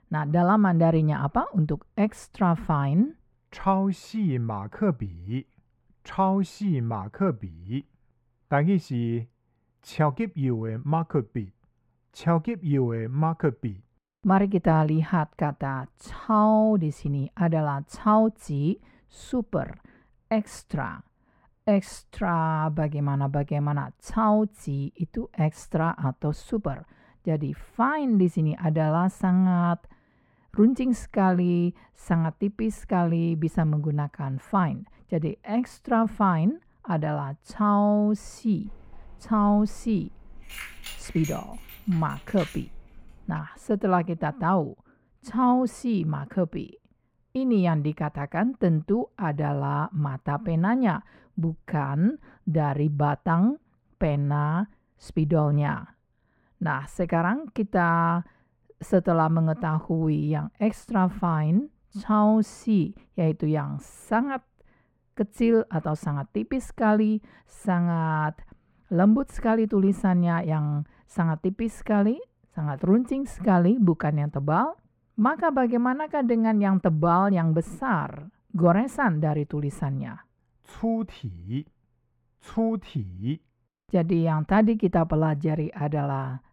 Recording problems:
muffled; very; fading above 3.5 kHz
jangling keys; faint; from 39 to 43 s; peak 10 dB below the speech

